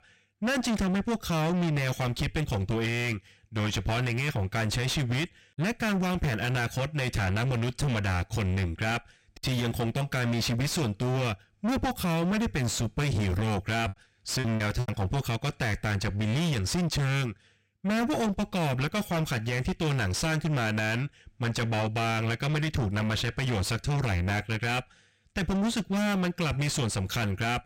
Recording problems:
distortion; heavy; 6 dB below the speech
choppy; occasionally; at 14 s; 5% of the speech affected

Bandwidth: 16 kHz